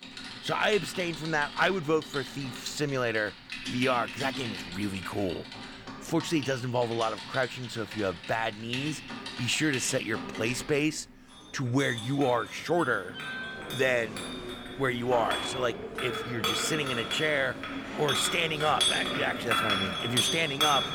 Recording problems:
household noises; loud; throughout; 4 dB below the speech

